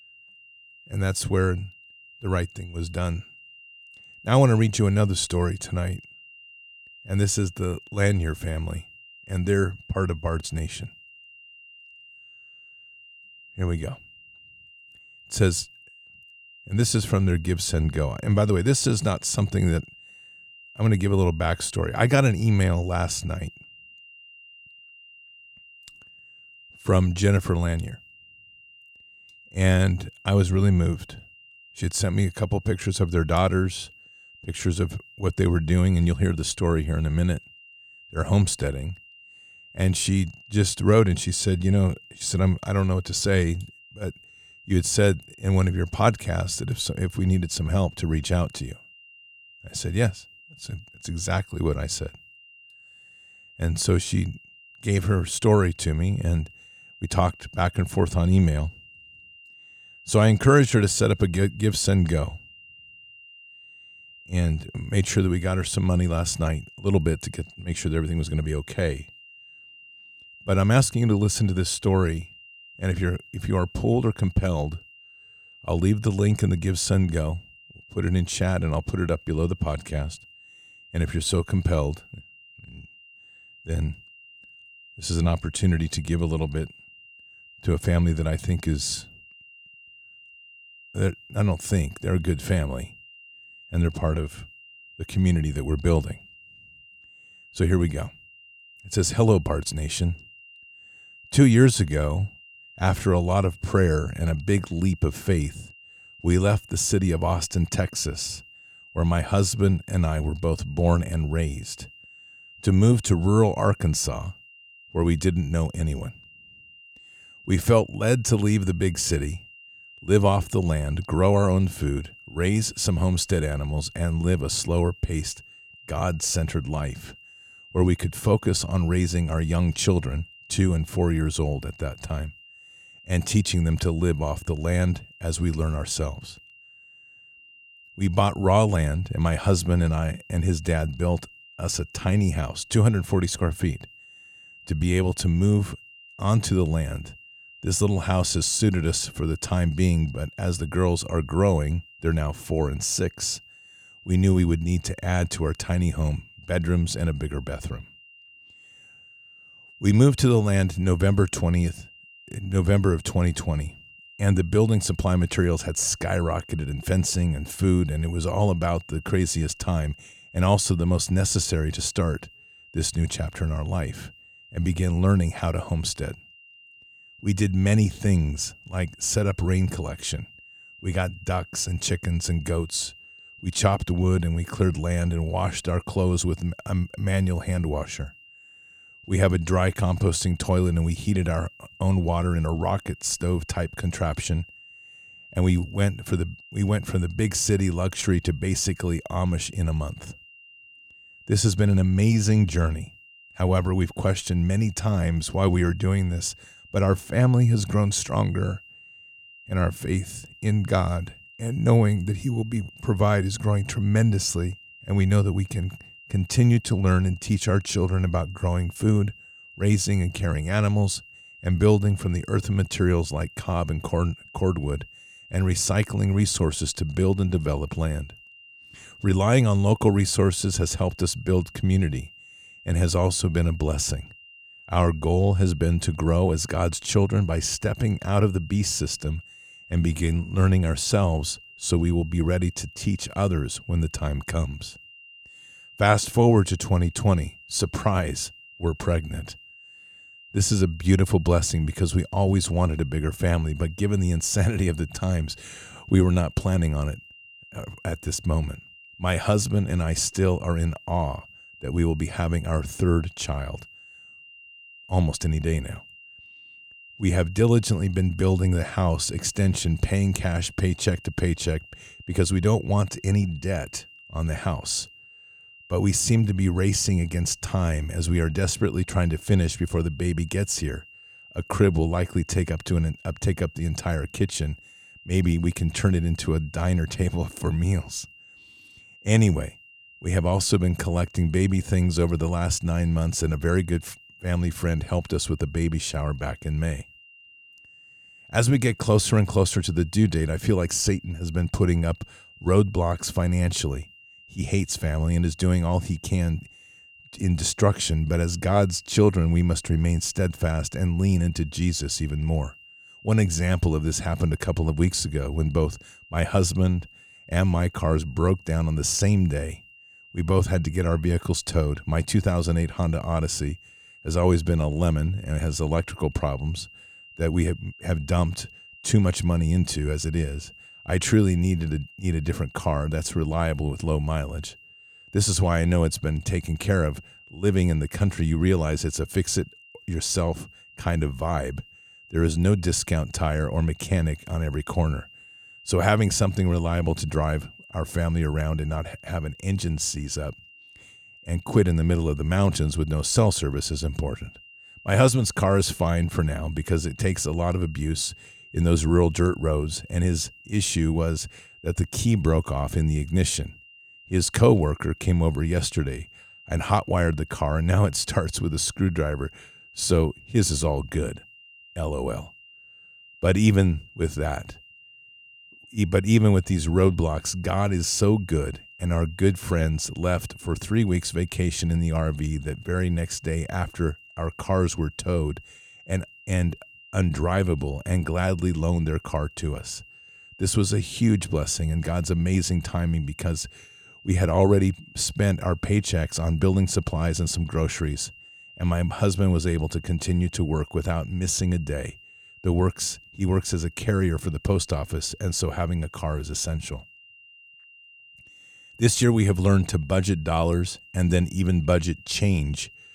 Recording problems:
high-pitched whine; faint; throughout; 3 kHz, 25 dB below the speech

